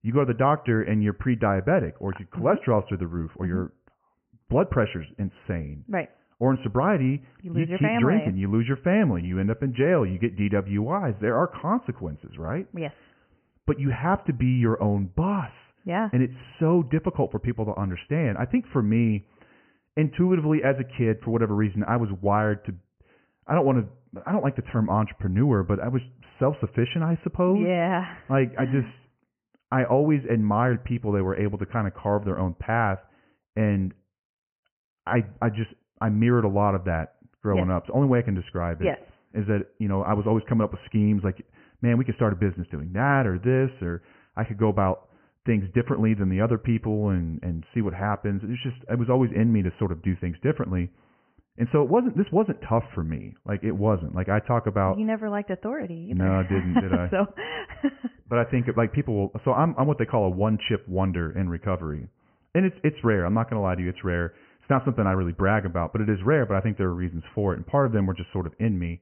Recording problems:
high frequencies cut off; severe; nothing above 3 kHz

